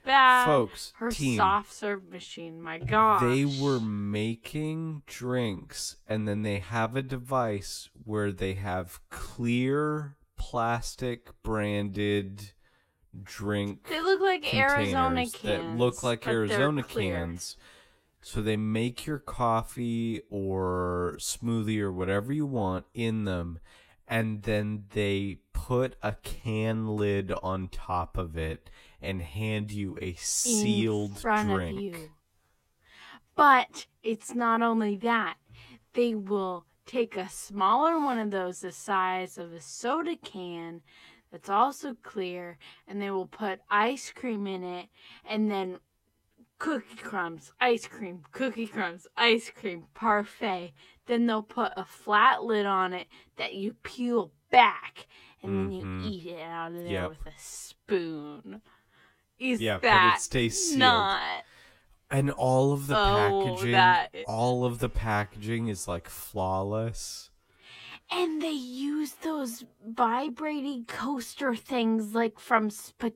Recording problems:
wrong speed, natural pitch; too slow; 0.6 times normal speed

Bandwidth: 16 kHz